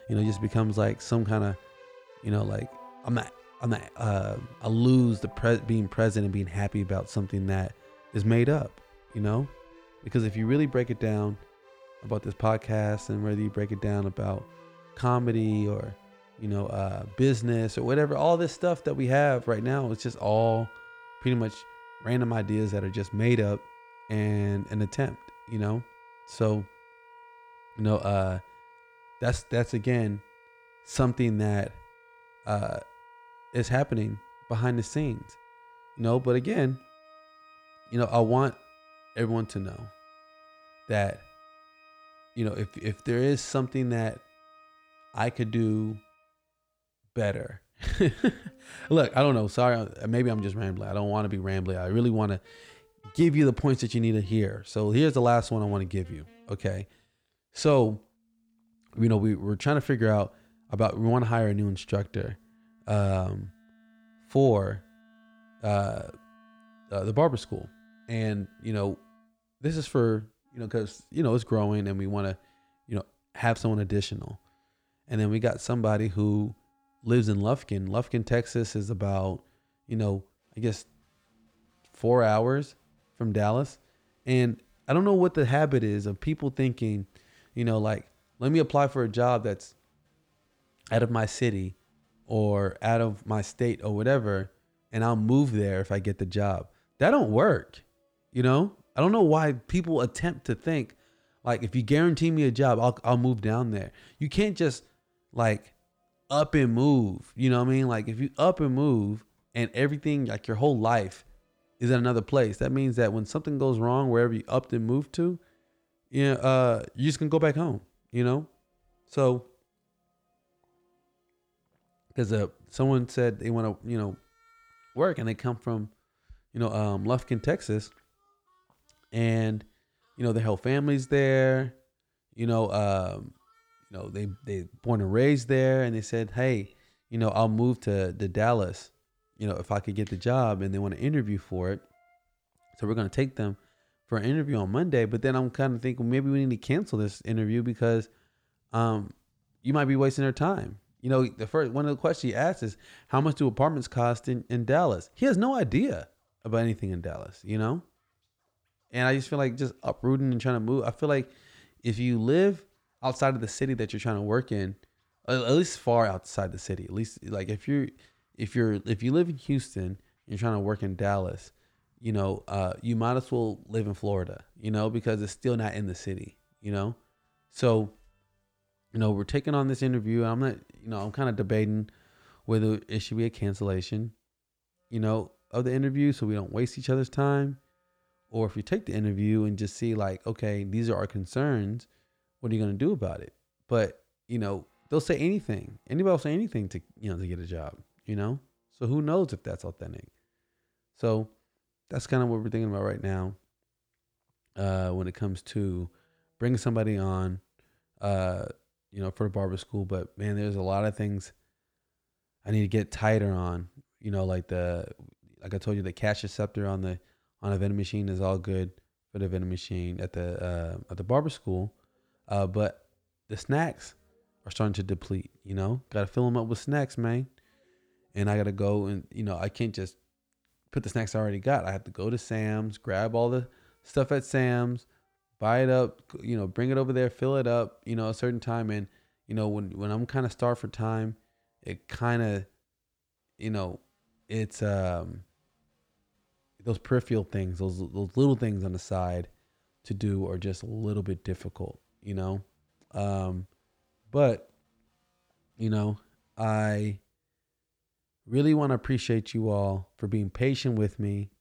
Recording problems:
background music; faint; throughout; 25 dB below the speech

